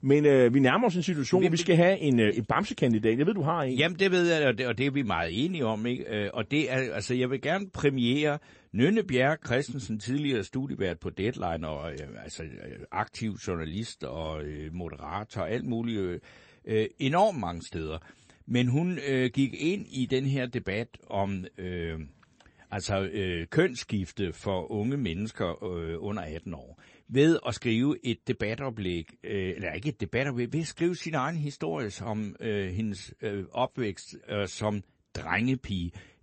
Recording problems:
garbled, watery; slightly; nothing above 8 kHz

